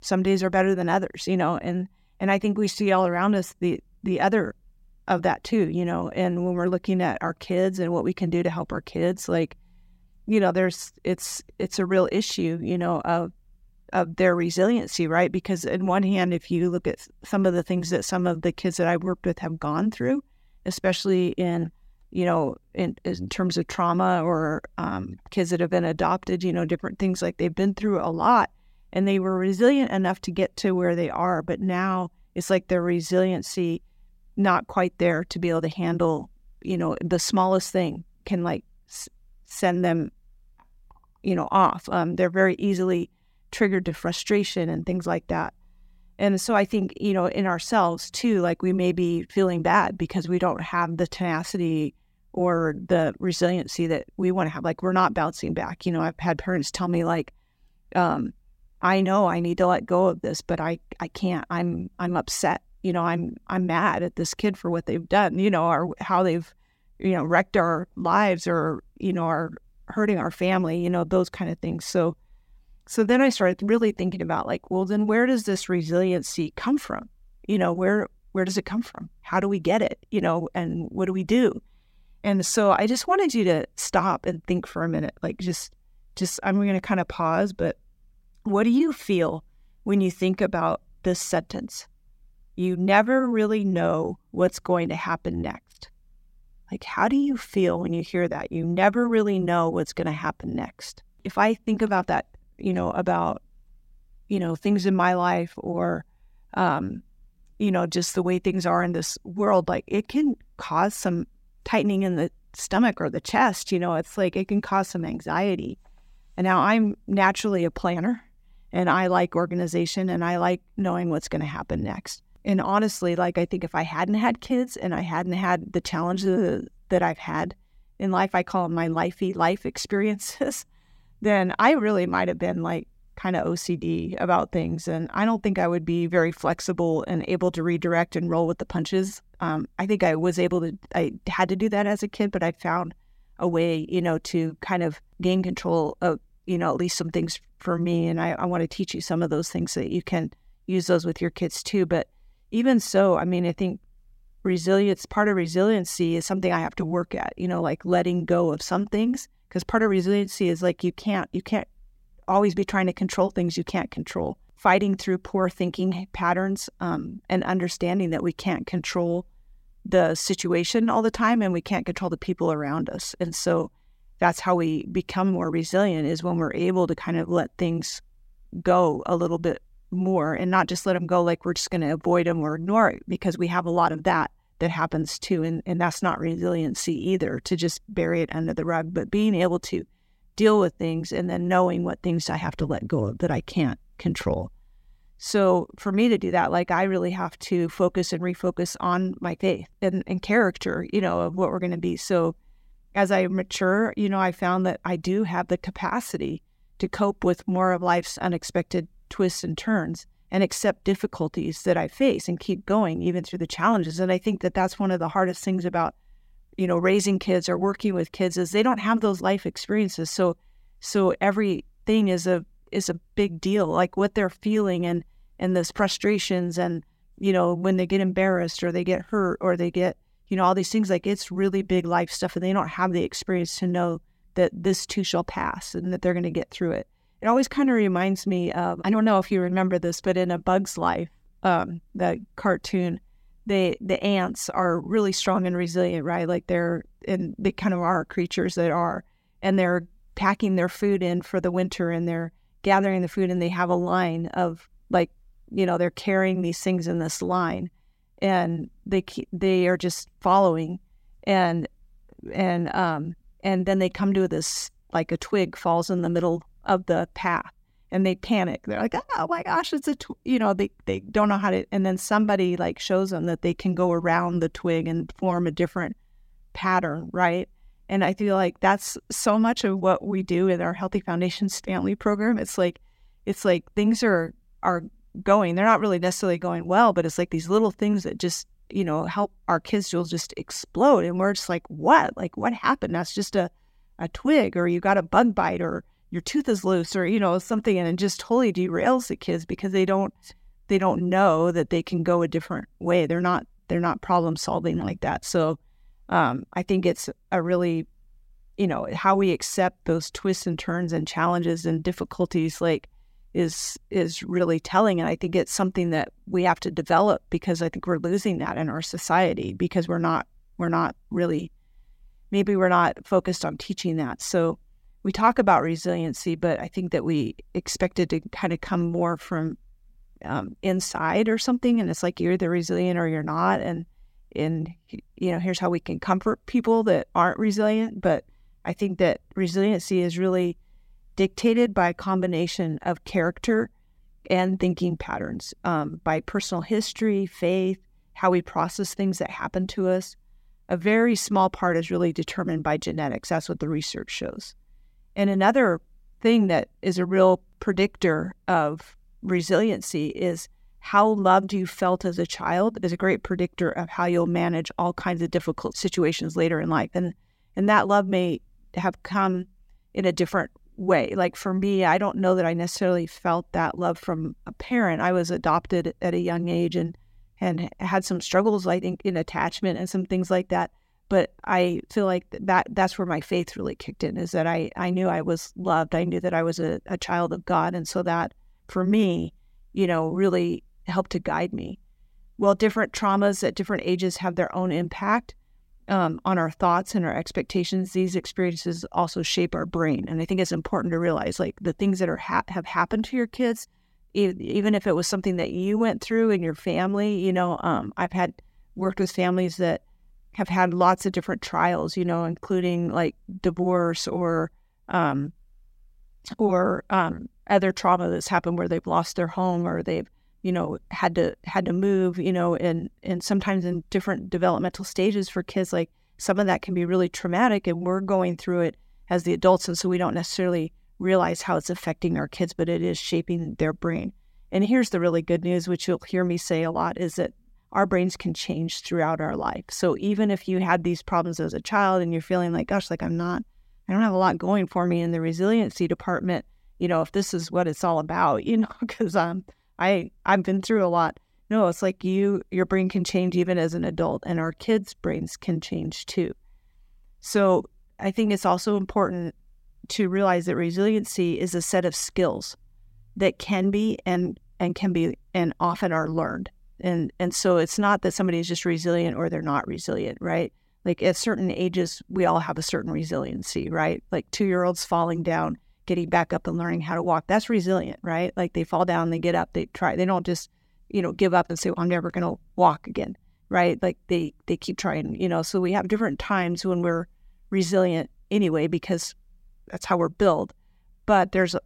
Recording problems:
none

